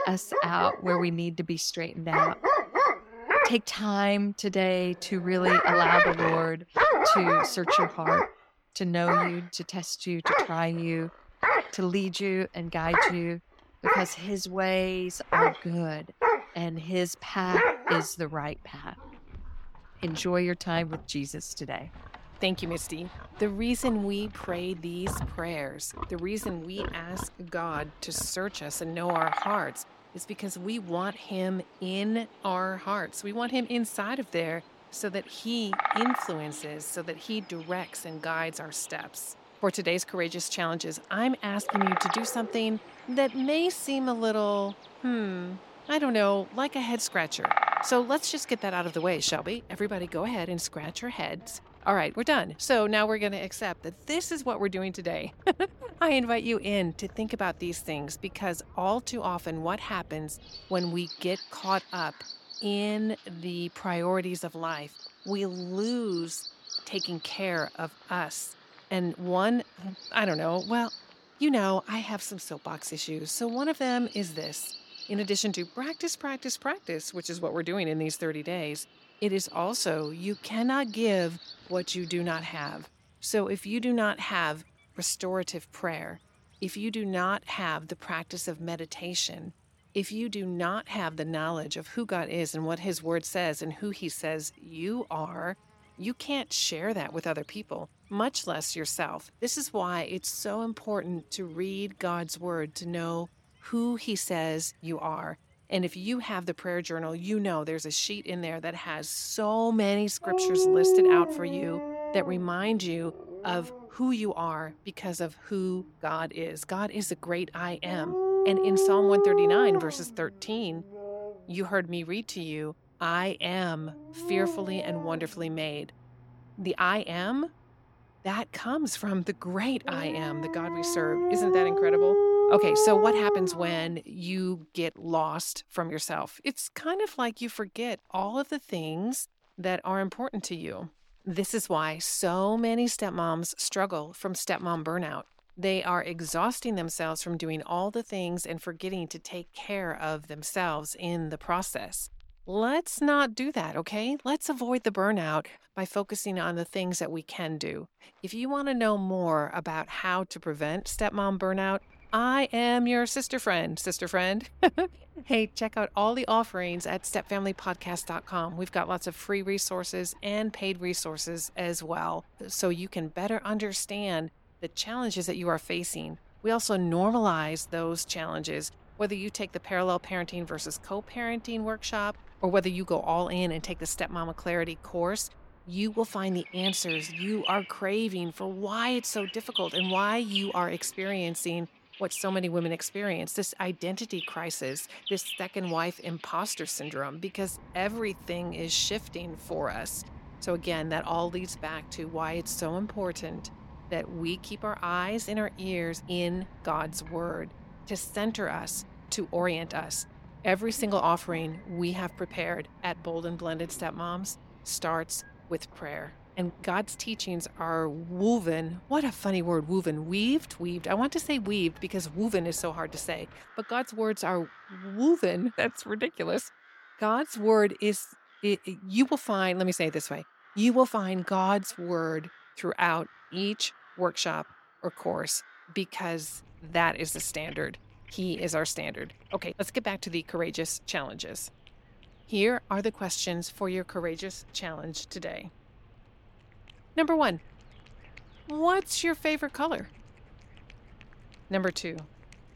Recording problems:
animal sounds; very loud; throughout; 2 dB above the speech

